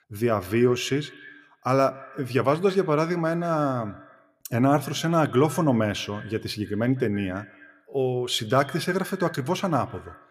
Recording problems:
echo of what is said; faint; throughout; 160 ms later, 20 dB below the speech

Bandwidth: 14.5 kHz